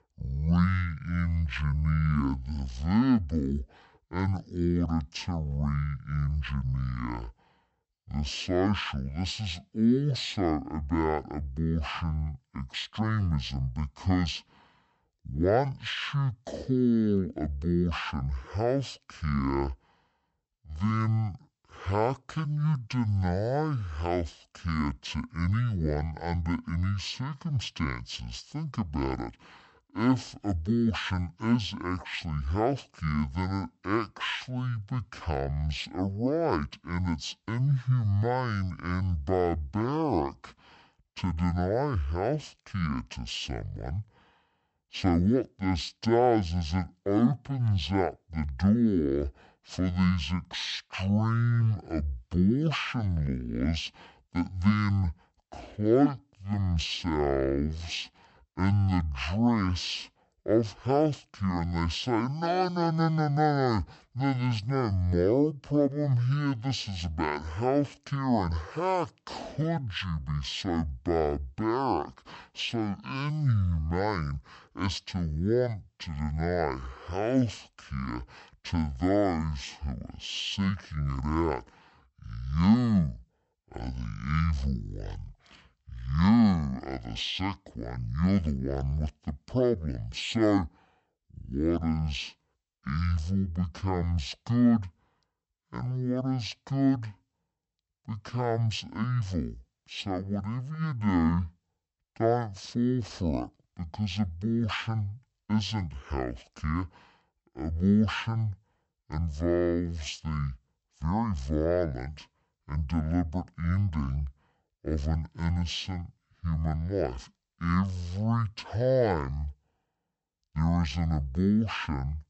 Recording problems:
wrong speed and pitch; too slow and too low; 0.5 times normal speed

